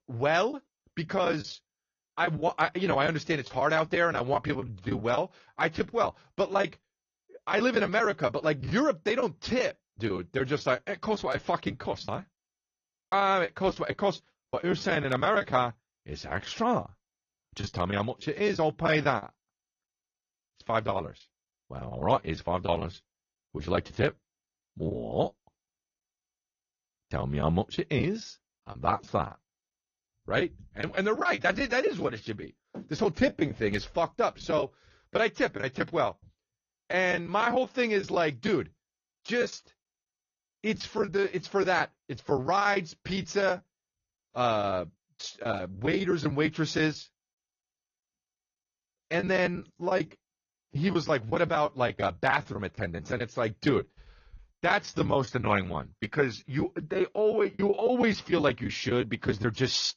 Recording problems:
garbled, watery; slightly; nothing above 6.5 kHz
choppy; very; 12% of the speech affected

